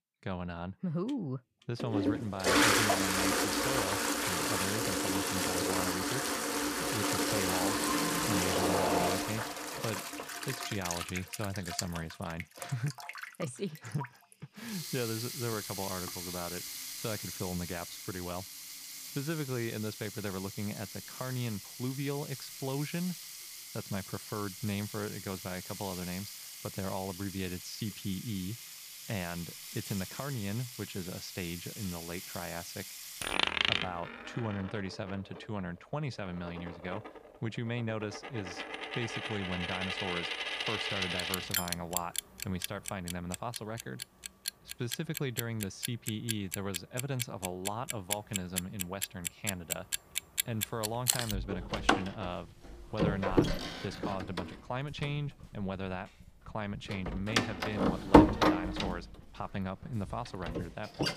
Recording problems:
household noises; very loud; throughout; 5 dB above the speech

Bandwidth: 15 kHz